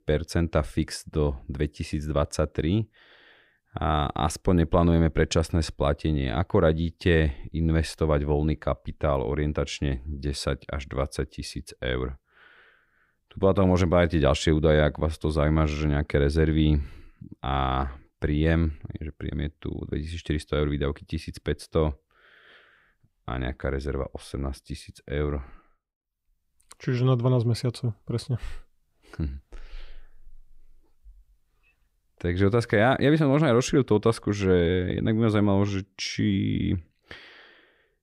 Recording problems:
none

